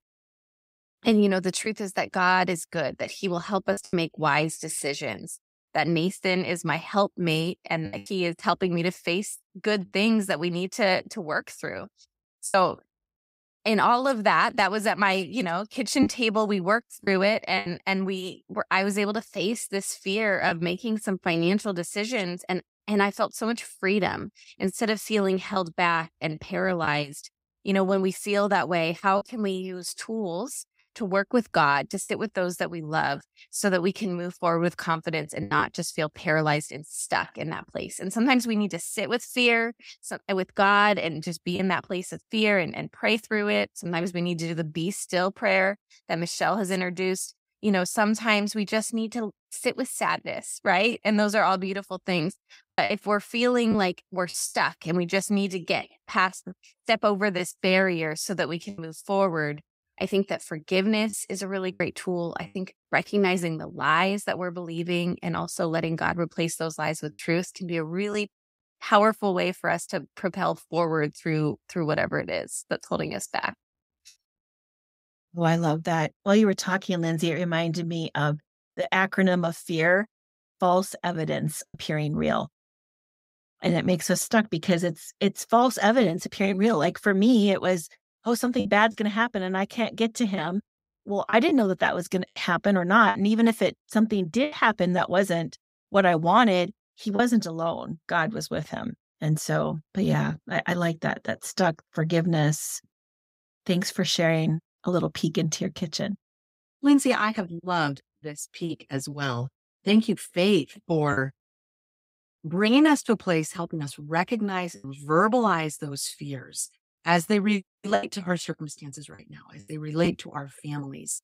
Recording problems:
choppy; occasionally; 2% of the speech affected

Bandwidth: 15.5 kHz